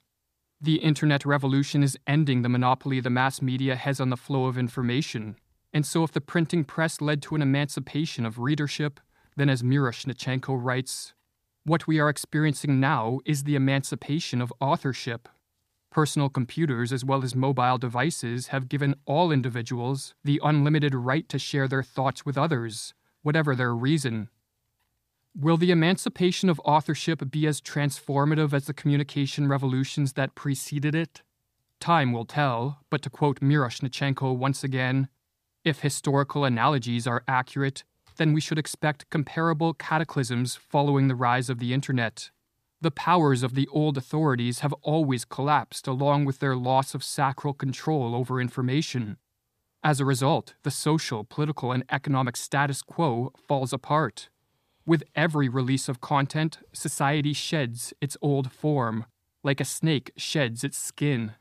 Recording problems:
none

